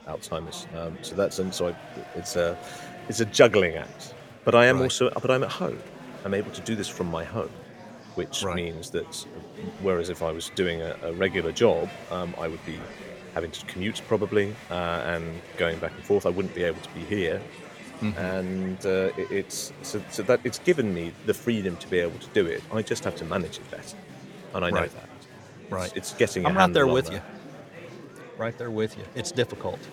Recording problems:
murmuring crowd; noticeable; throughout; 15 dB below the speech

